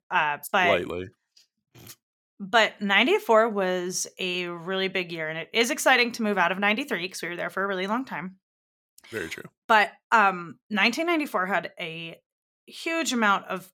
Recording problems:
none

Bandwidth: 17 kHz